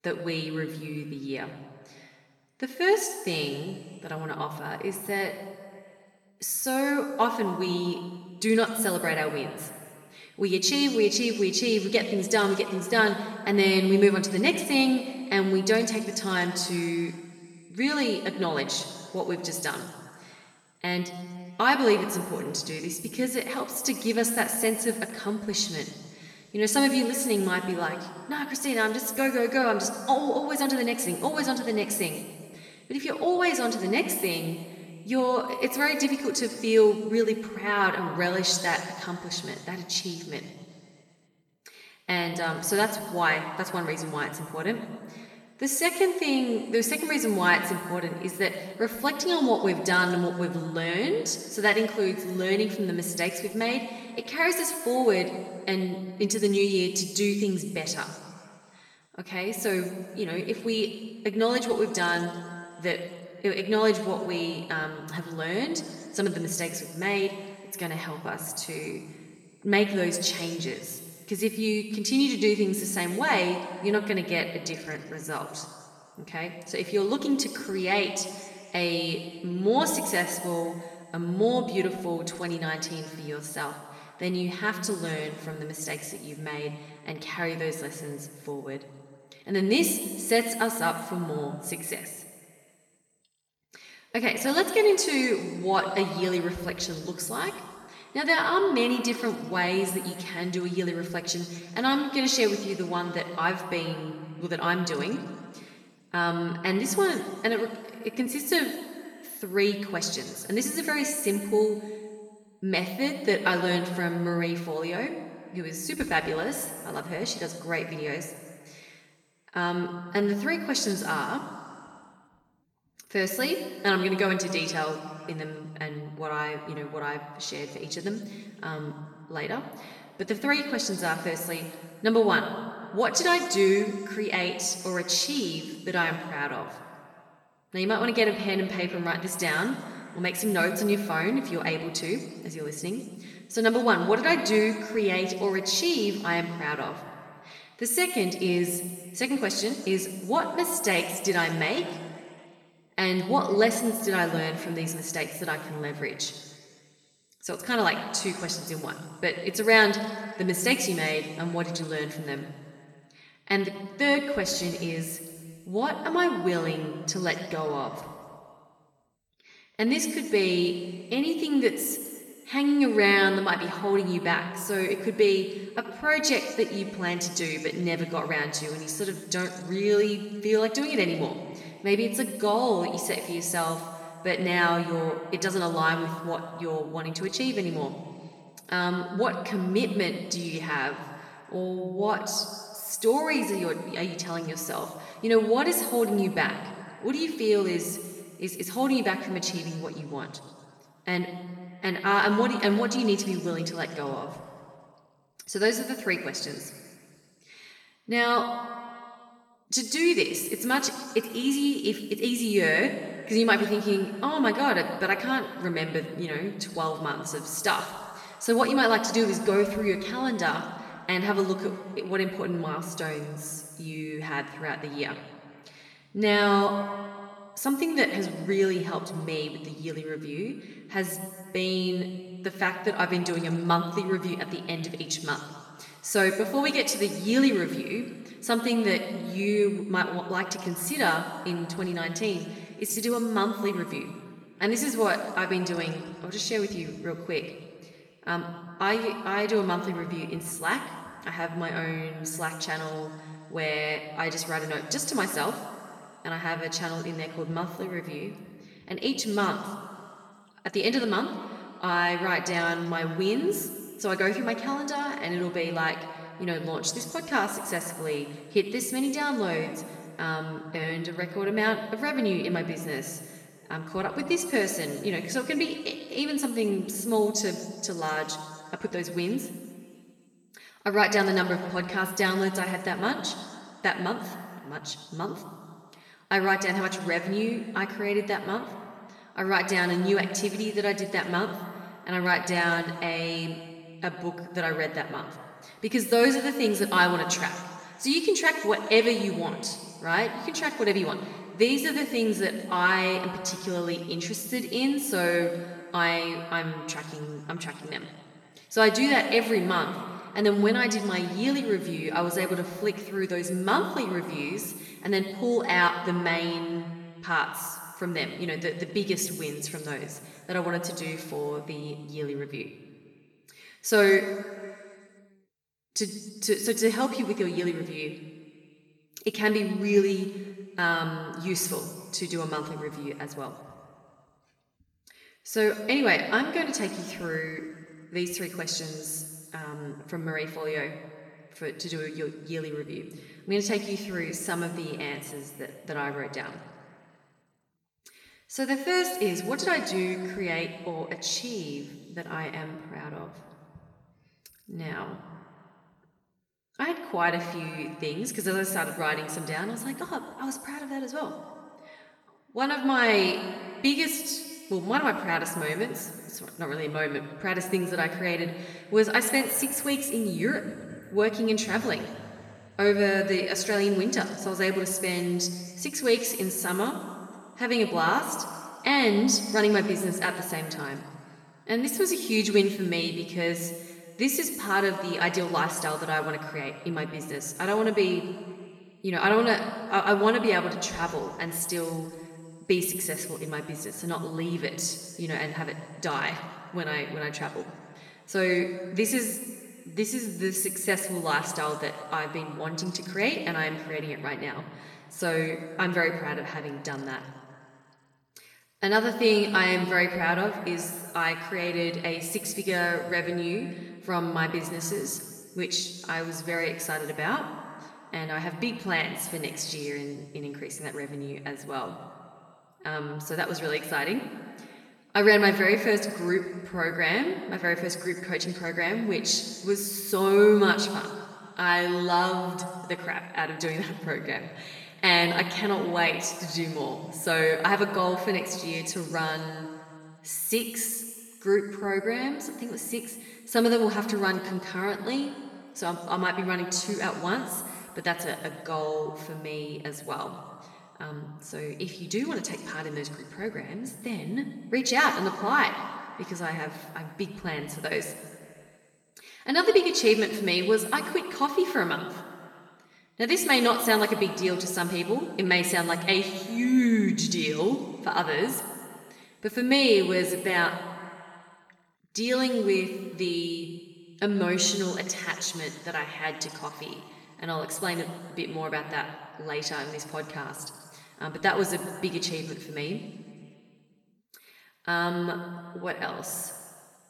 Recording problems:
room echo; noticeable; dies away in 1.7 s
off-mic speech; somewhat distant

